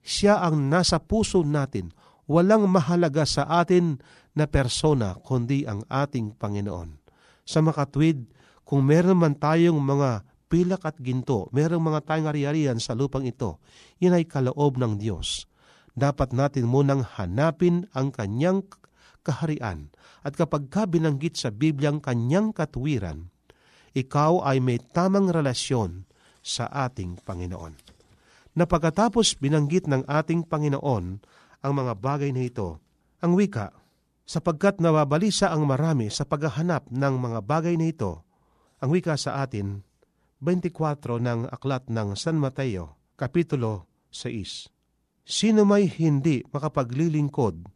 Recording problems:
none

